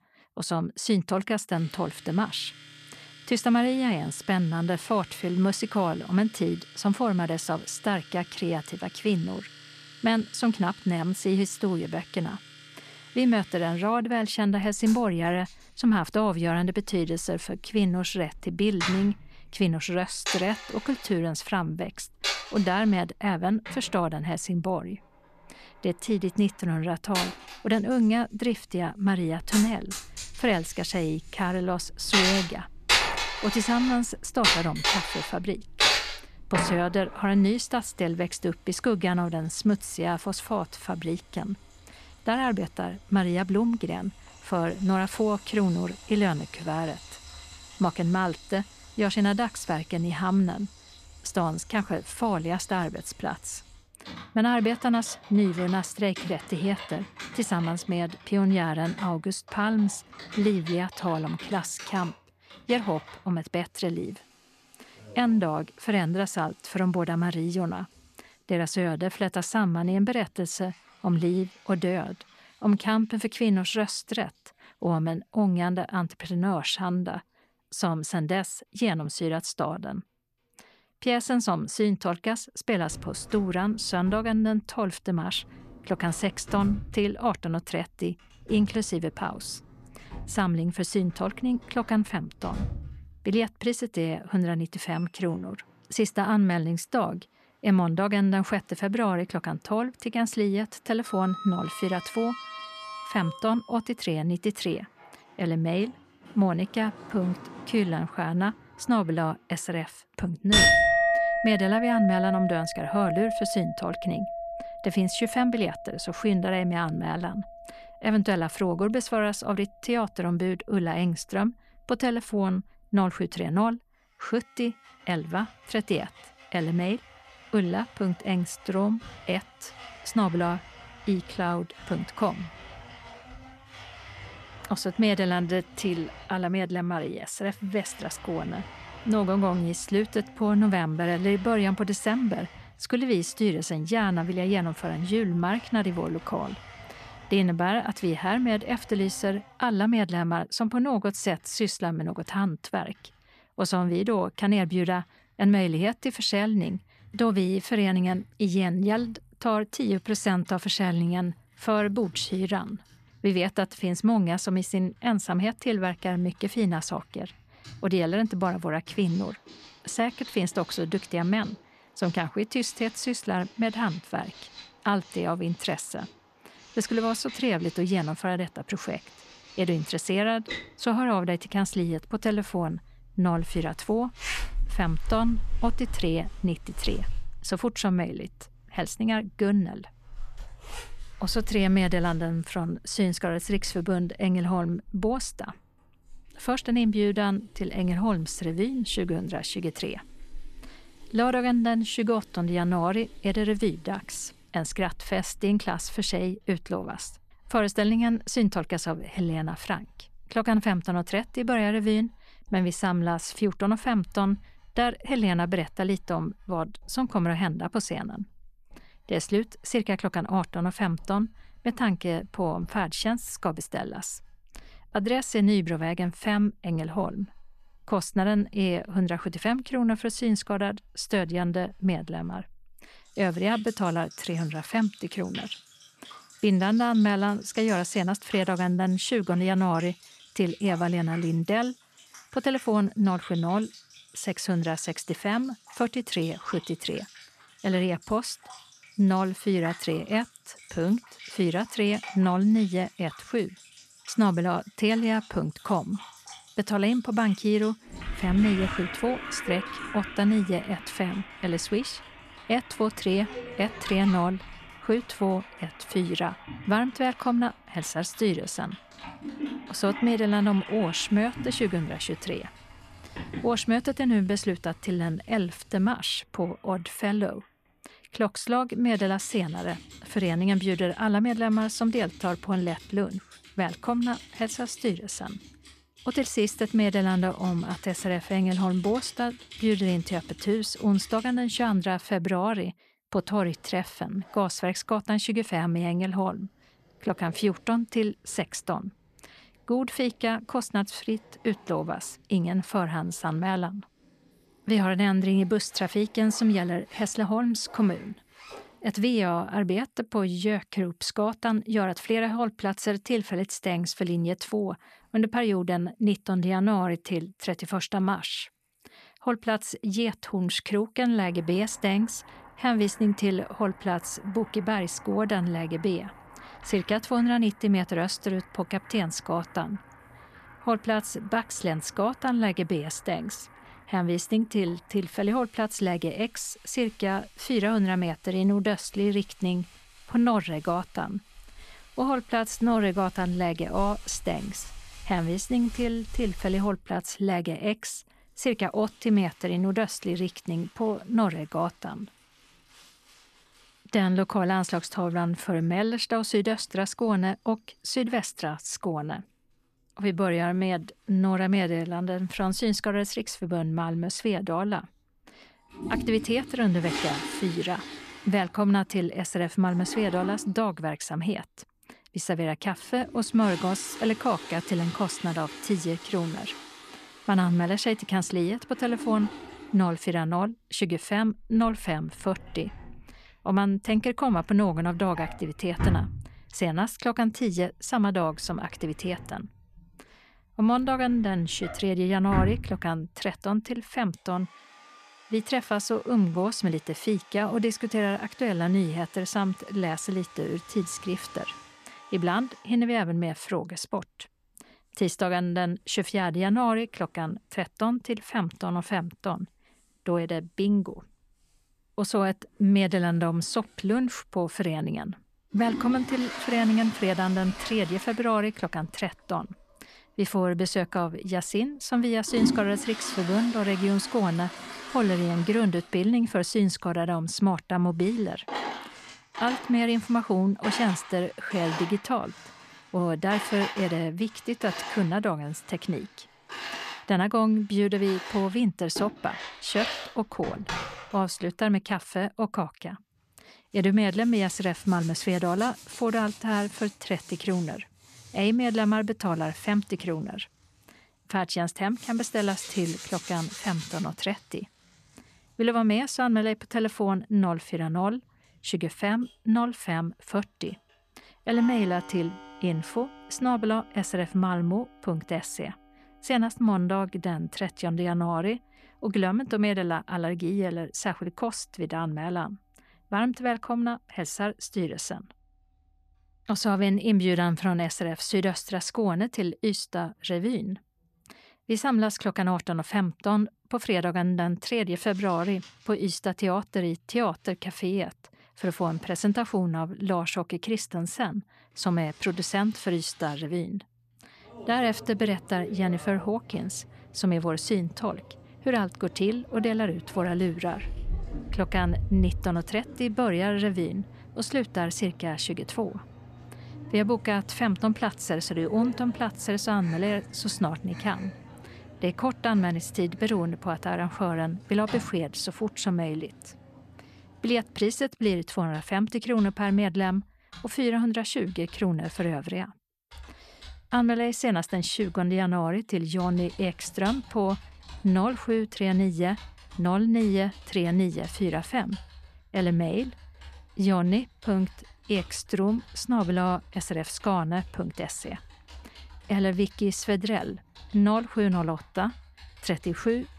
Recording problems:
household noises; loud; throughout; 10 dB below the speech

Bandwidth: 14 kHz